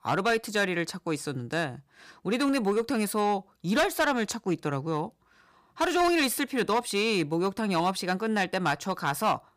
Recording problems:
distortion; slight; 5% of the sound clipped

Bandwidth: 15 kHz